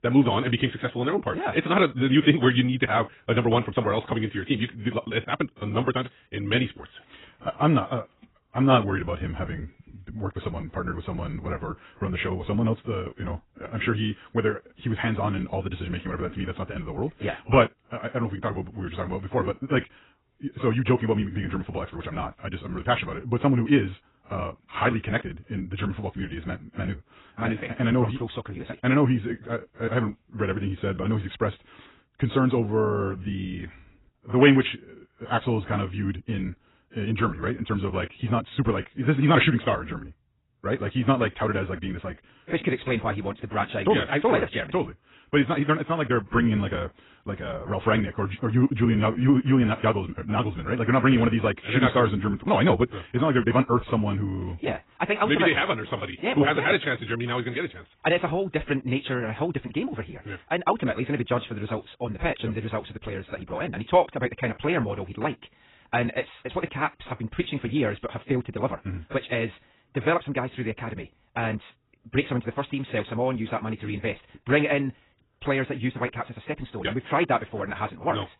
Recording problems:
garbled, watery; badly; nothing above 4 kHz
wrong speed, natural pitch; too fast; 1.6 times normal speed

